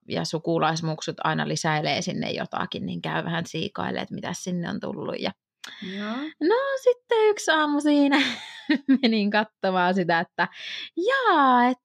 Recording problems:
none

